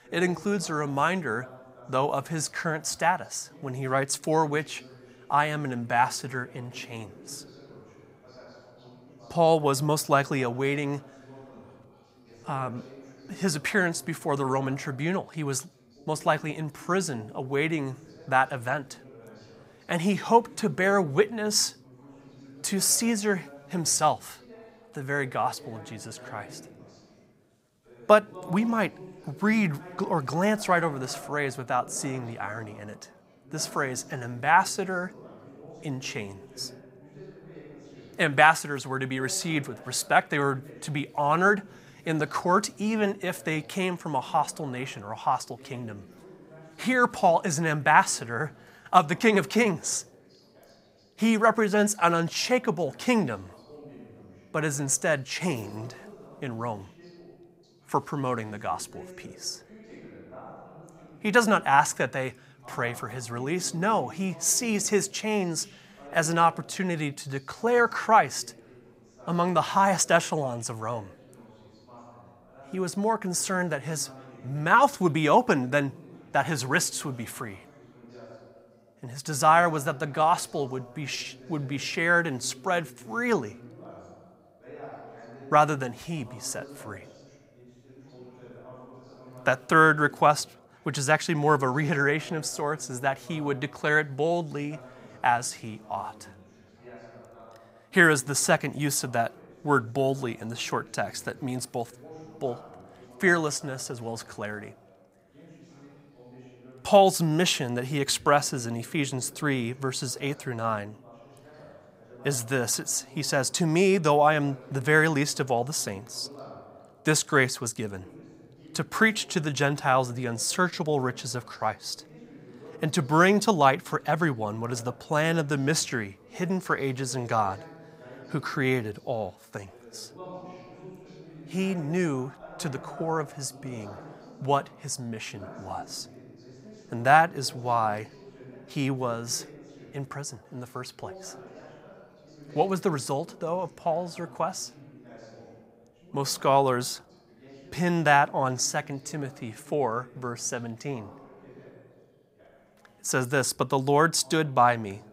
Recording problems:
background chatter; faint; throughout; 2 voices, 25 dB below the speech

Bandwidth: 15.5 kHz